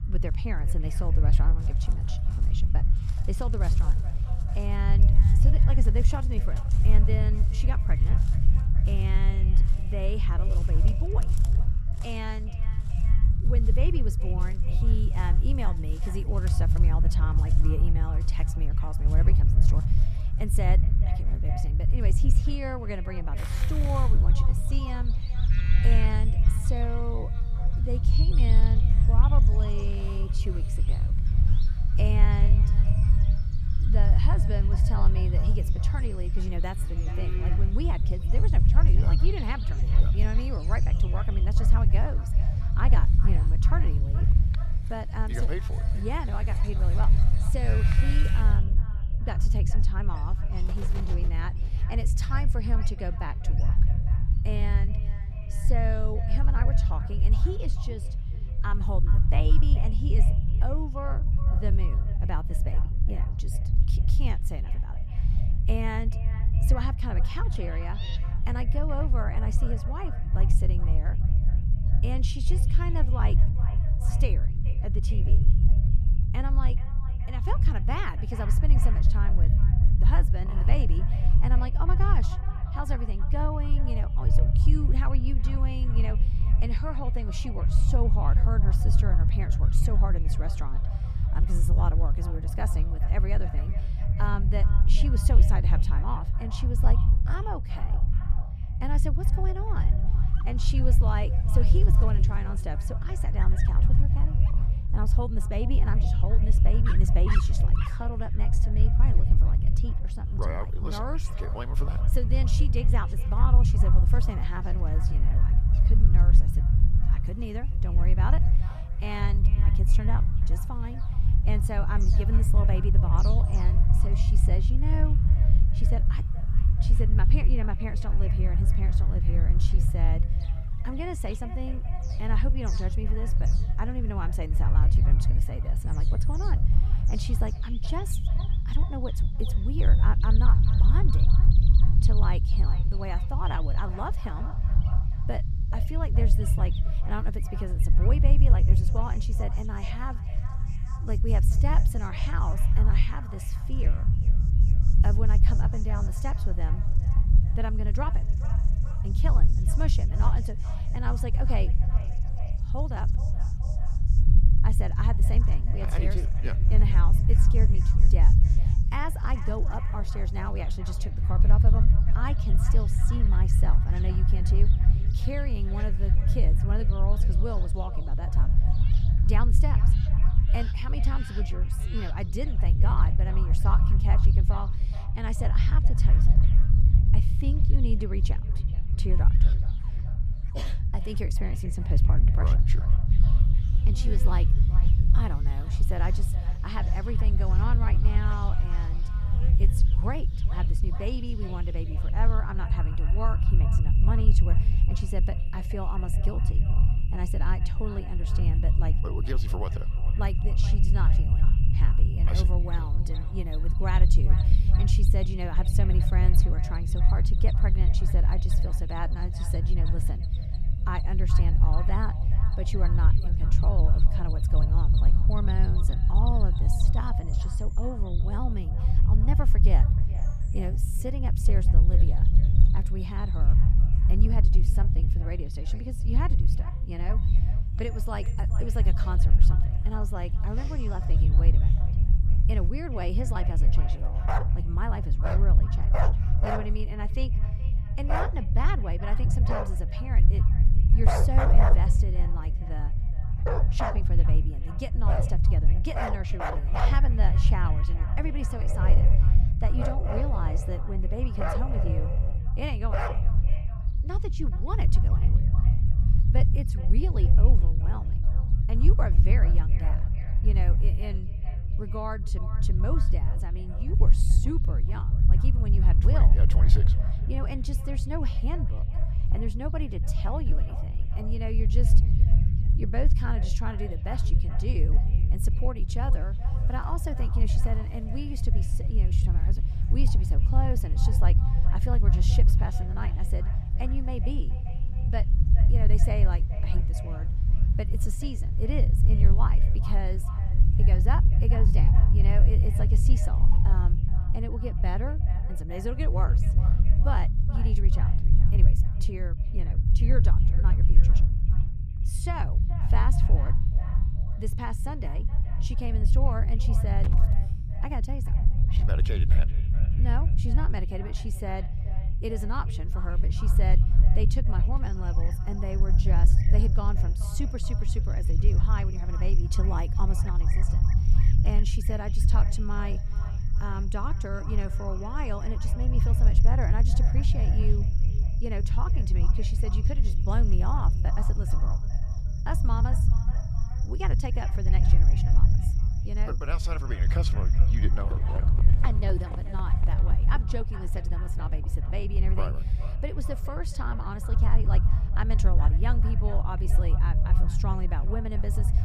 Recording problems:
echo of what is said; noticeable; throughout; 430 ms later, 15 dB below the speech
animal sounds; loud; throughout; 8 dB below the speech
low rumble; loud; throughout; 5 dB below the speech

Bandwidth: 14.5 kHz